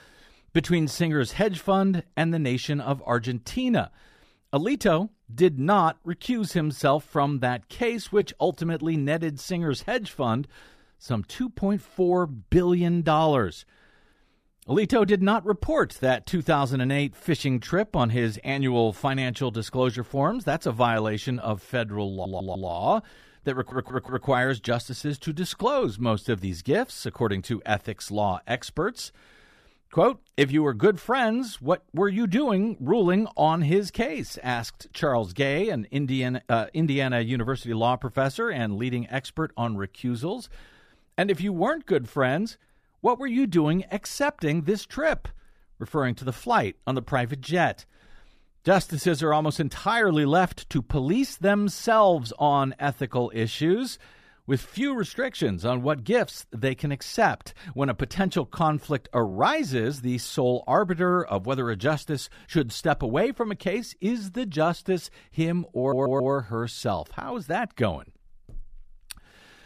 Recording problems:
audio stuttering; at 22 s, at 24 s and at 1:06

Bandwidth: 14.5 kHz